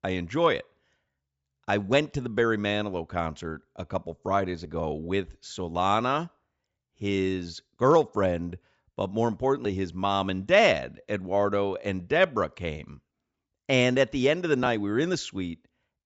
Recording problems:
high frequencies cut off; noticeable; nothing above 8 kHz

